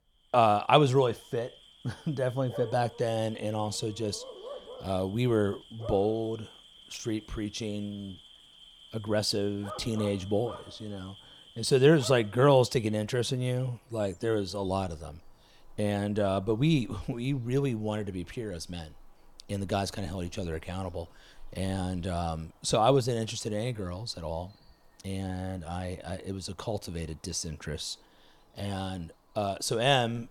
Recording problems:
animal sounds; noticeable; throughout; 20 dB below the speech

